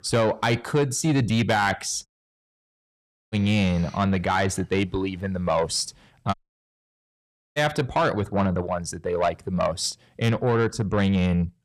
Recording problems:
distortion; slight; 10 dB below the speech
audio cutting out; at 2 s for 1.5 s and at 6.5 s for 1 s

